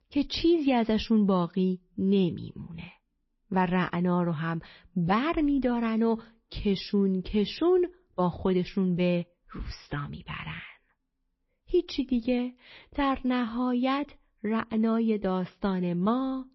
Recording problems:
garbled, watery; slightly; nothing above 5.5 kHz

